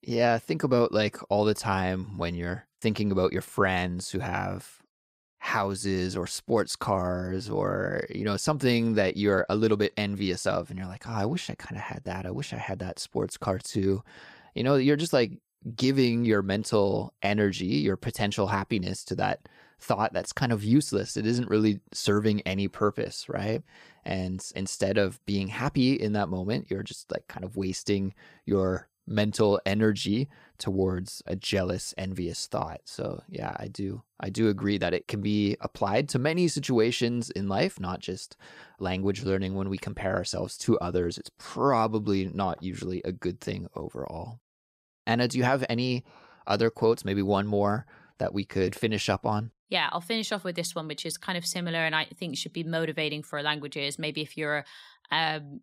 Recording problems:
none

